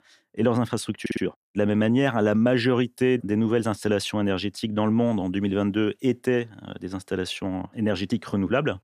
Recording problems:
audio stuttering; at 1 s

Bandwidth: 14.5 kHz